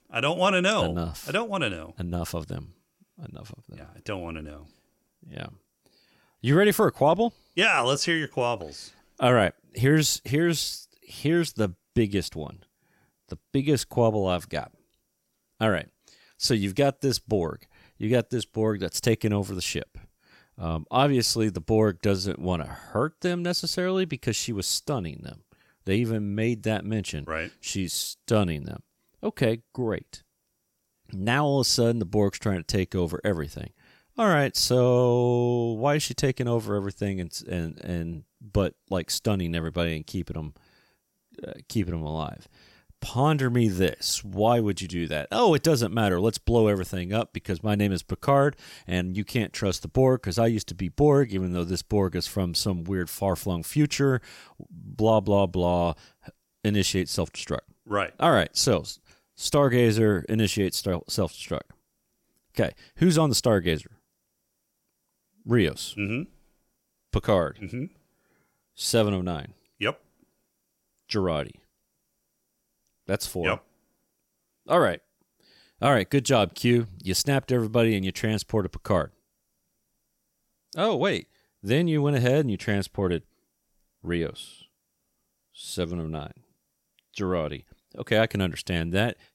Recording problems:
none

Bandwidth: 16.5 kHz